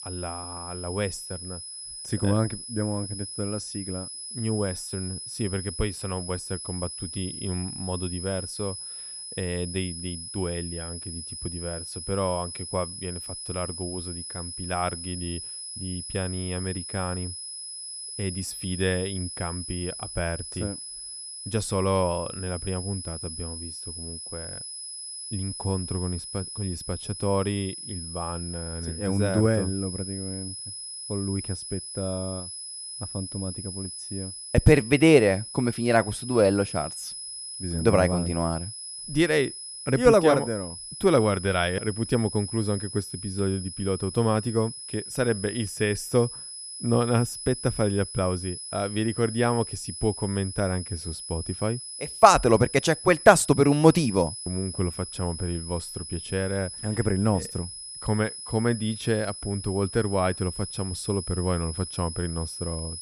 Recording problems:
high-pitched whine; loud; throughout; 10 kHz, 8 dB below the speech

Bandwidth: 14.5 kHz